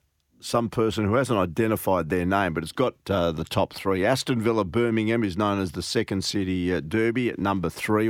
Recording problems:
abrupt cut into speech; at the end

